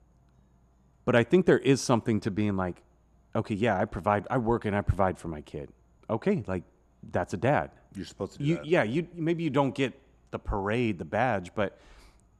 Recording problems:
muffled; slightly; fading above 2 kHz

